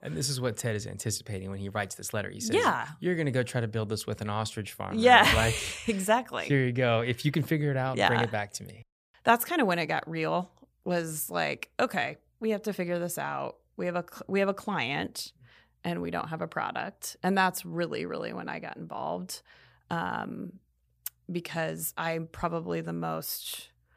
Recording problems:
none

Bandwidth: 15 kHz